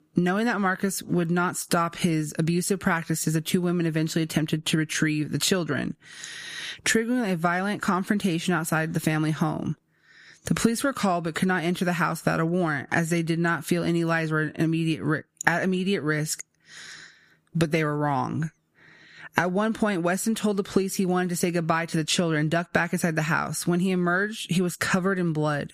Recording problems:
squashed, flat; somewhat

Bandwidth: 15 kHz